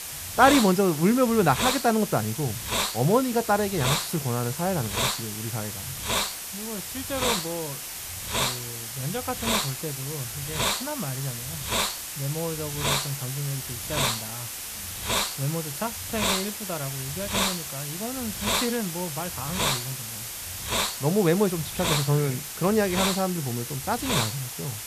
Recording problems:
hiss; loud; throughout; 1 dB below the speech

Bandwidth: 14.5 kHz